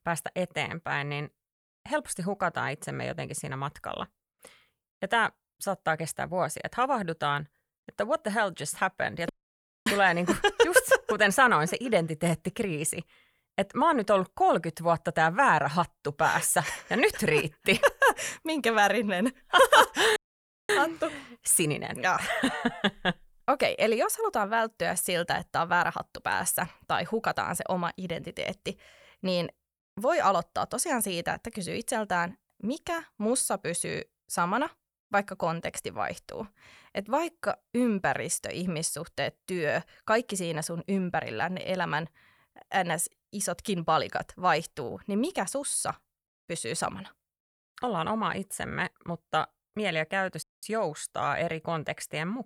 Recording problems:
audio cutting out; at 9.5 s for 0.5 s, at 20 s for 0.5 s and at 50 s

